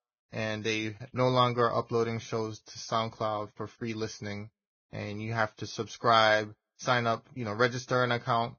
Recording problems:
garbled, watery; badly; nothing above 6.5 kHz

